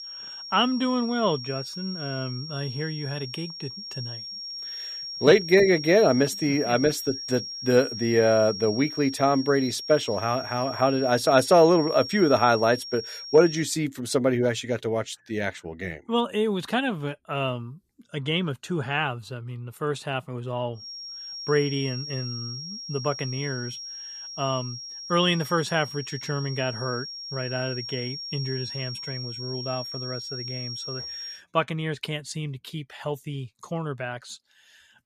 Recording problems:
high-pitched whine; loud; until 14 s and from 21 to 31 s; 5.5 kHz, 9 dB below the speech

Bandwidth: 14.5 kHz